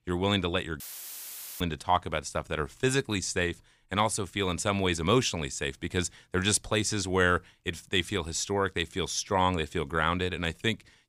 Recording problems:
audio cutting out; filled with static; at 1 s for 1 s

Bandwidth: 15 kHz